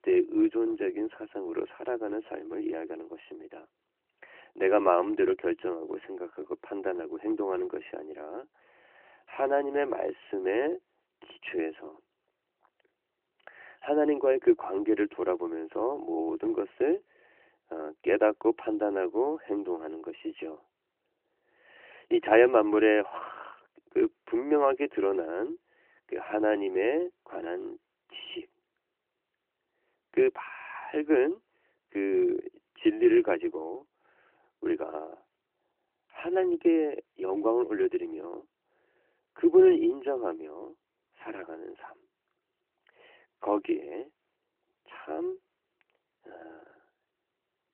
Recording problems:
phone-call audio; nothing above 3 kHz

